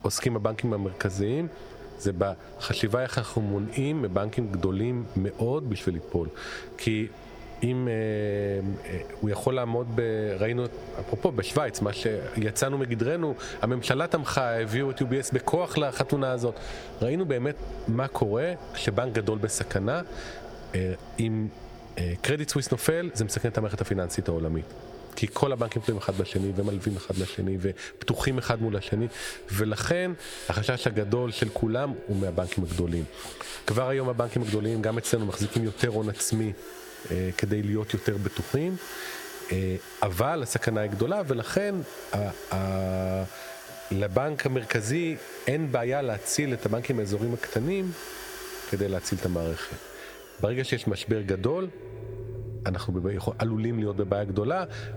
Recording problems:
squashed, flat; heavily, background pumping
echo of what is said; noticeable; throughout; 90 ms later, 15 dB below the speech
machinery noise; noticeable; throughout; 15 dB below the speech

